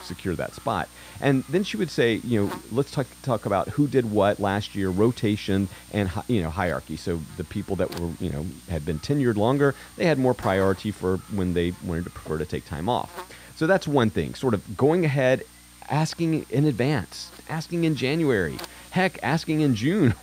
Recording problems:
electrical hum; noticeable; throughout; 60 Hz, 20 dB below the speech

